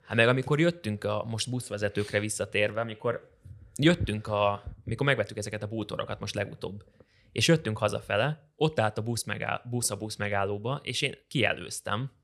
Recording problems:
none

